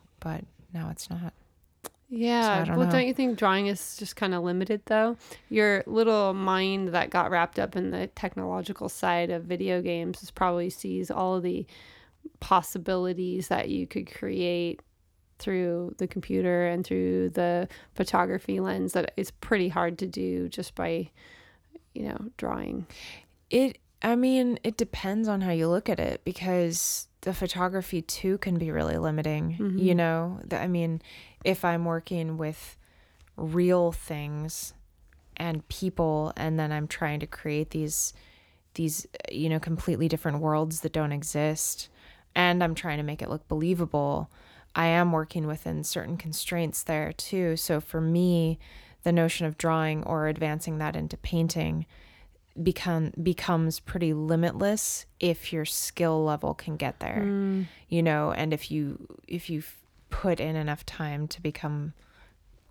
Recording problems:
none

